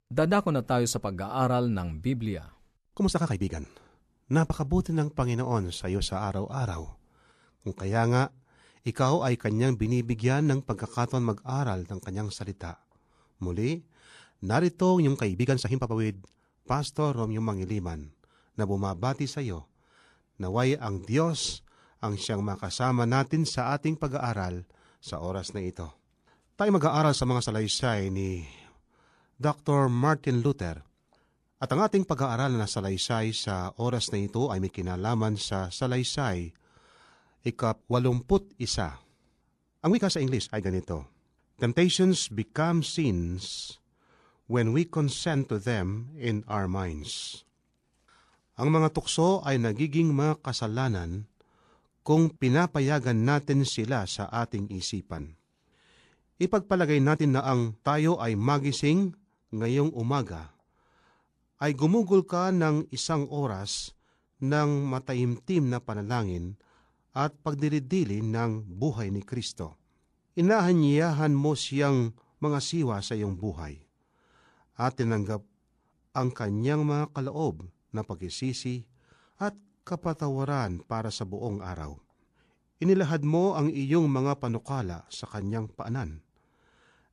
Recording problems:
uneven, jittery; strongly; from 3 s to 1:26

